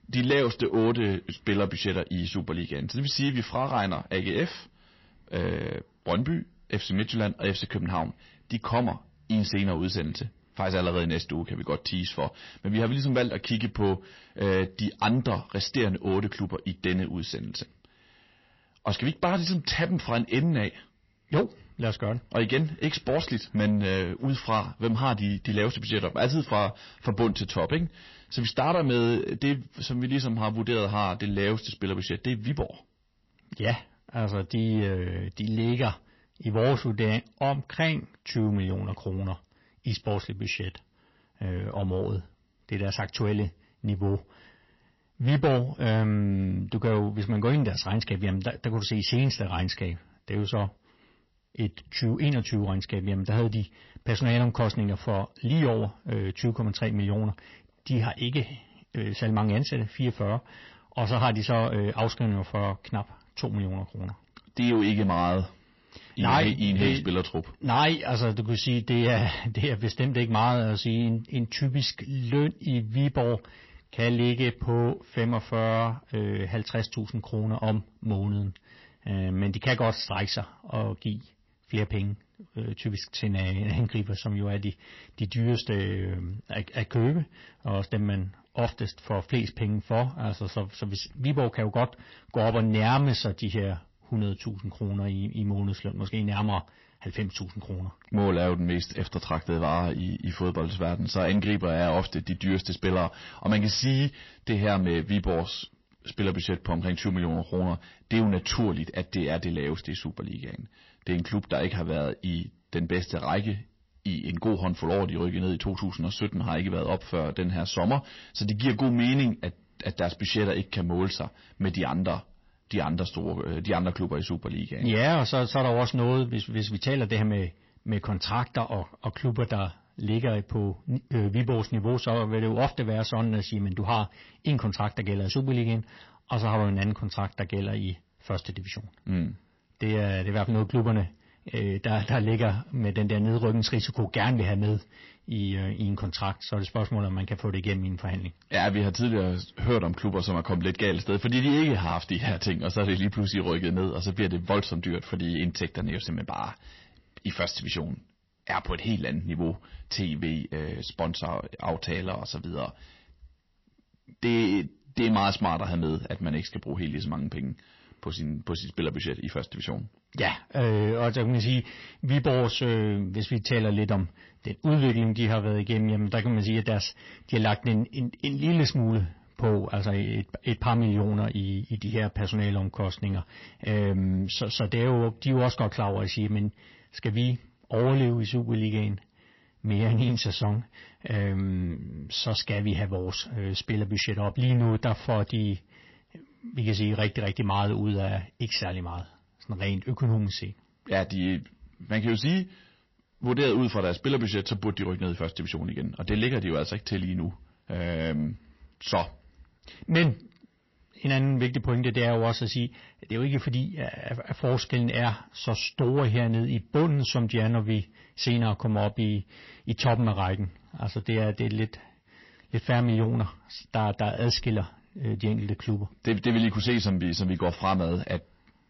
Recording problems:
distortion; slight; 10 dB below the speech
garbled, watery; slightly; nothing above 5.5 kHz

